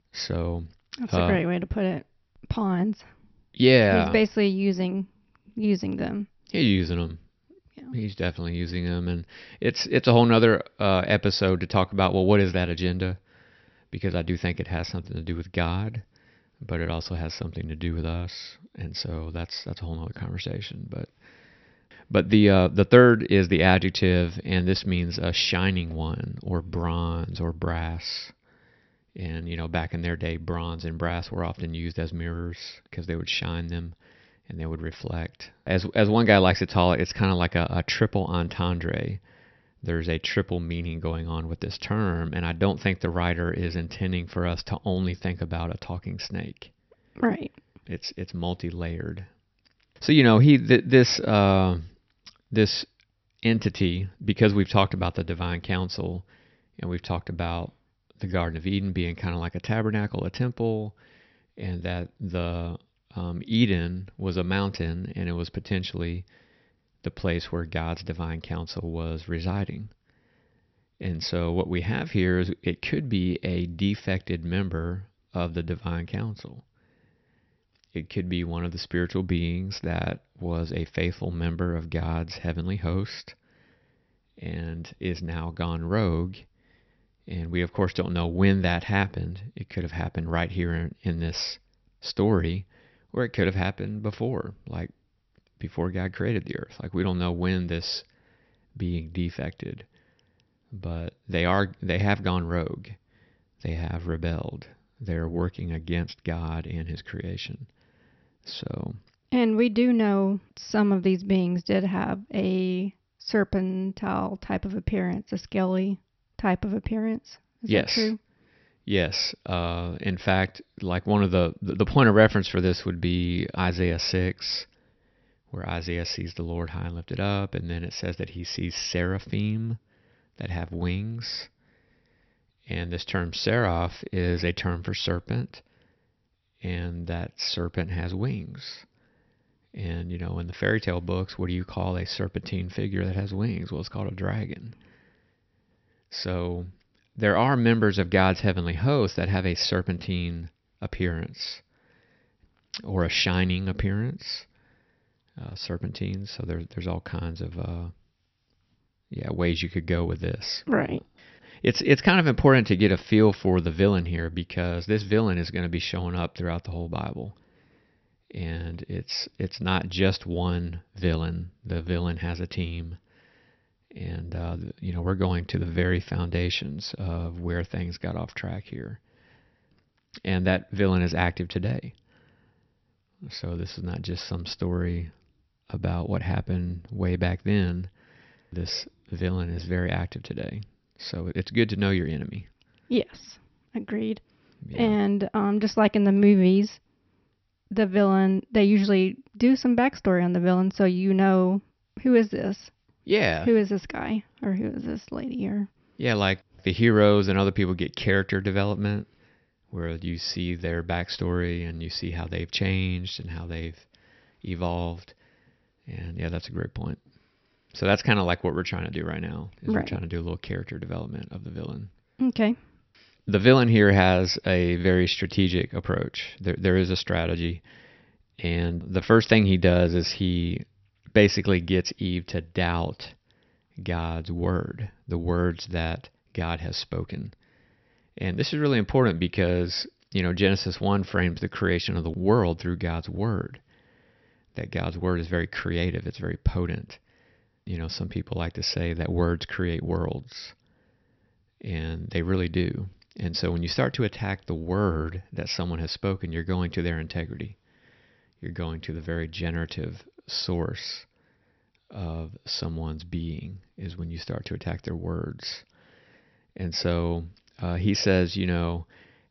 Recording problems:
high frequencies cut off; noticeable; nothing above 6 kHz

